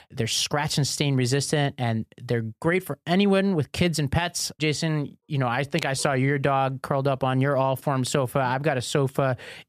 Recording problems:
none

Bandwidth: 14.5 kHz